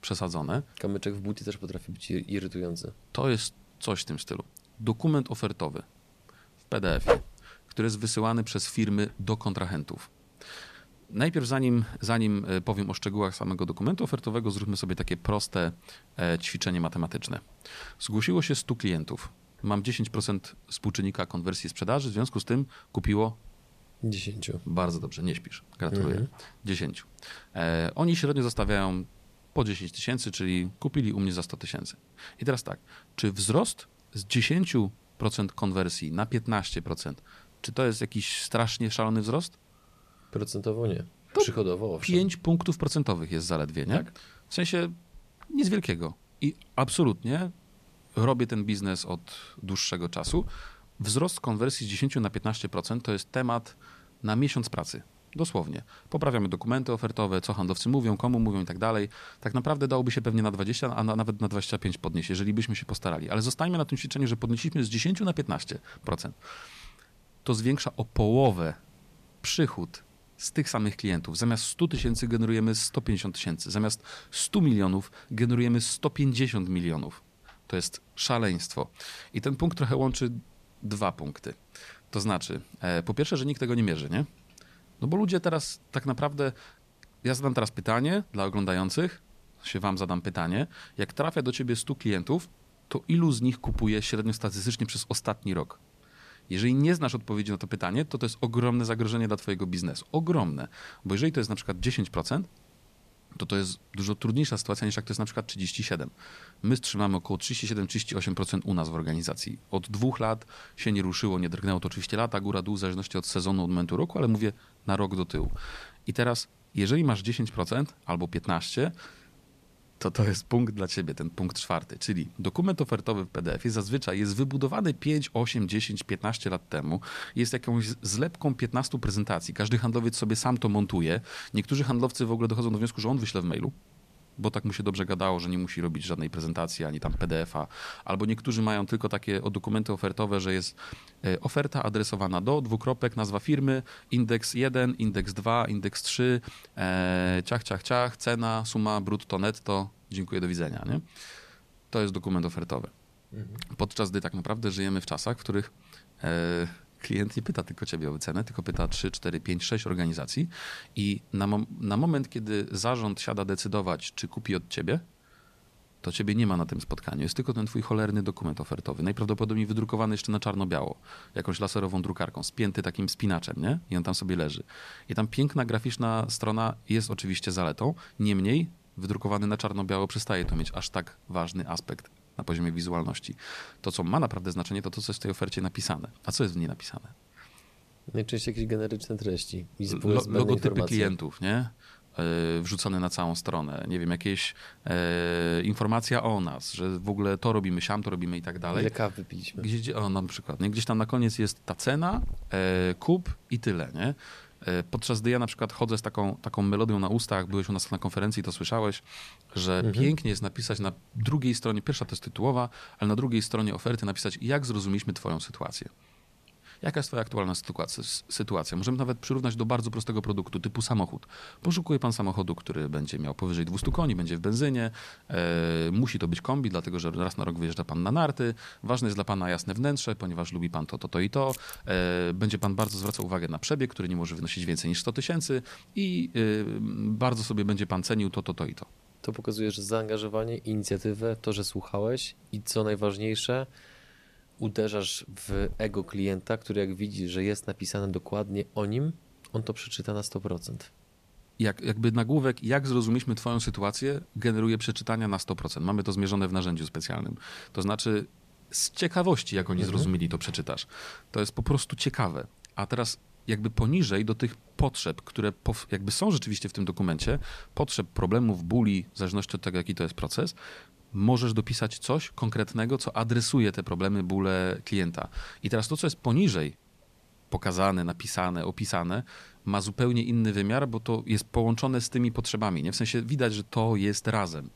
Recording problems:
hiss; faint; throughout; 25 dB below the speech

